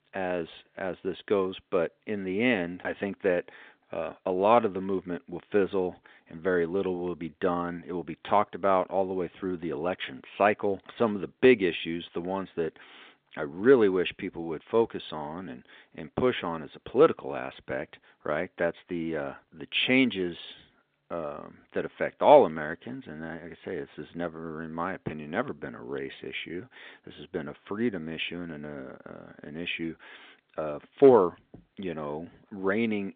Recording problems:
phone-call audio

